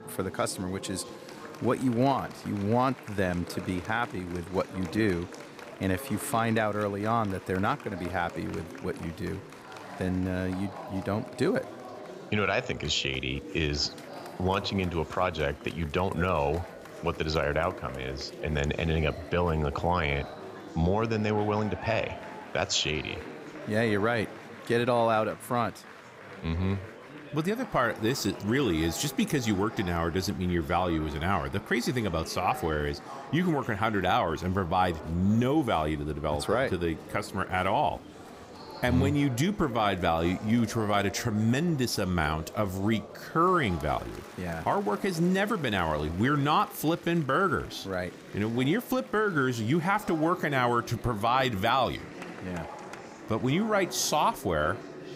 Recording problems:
murmuring crowd; noticeable; throughout; 15 dB below the speech

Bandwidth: 15.5 kHz